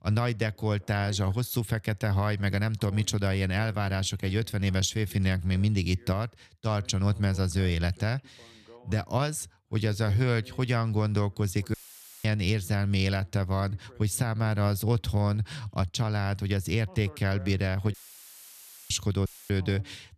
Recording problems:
voice in the background; faint; throughout; 25 dB below the speech
audio cutting out; filled with static; at 12 s for 0.5 s, at 18 s for 1 s and at 19 s

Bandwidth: 14 kHz